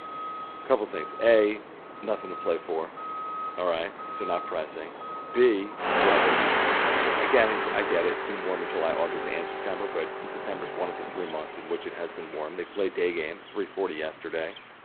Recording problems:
phone-call audio; poor line; nothing above 4 kHz
traffic noise; loud; throughout; as loud as the speech

